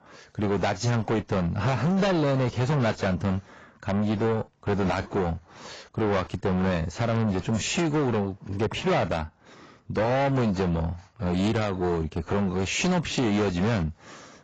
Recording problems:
distortion; heavy; 6 dB below the speech
garbled, watery; badly; nothing above 7.5 kHz

